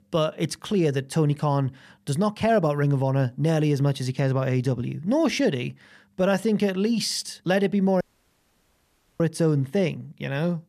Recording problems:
audio cutting out; at 8 s for 1 s

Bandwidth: 14.5 kHz